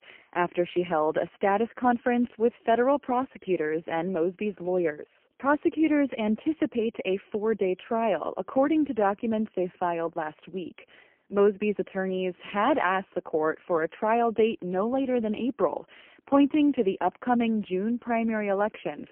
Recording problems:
phone-call audio; poor line; nothing above 3 kHz

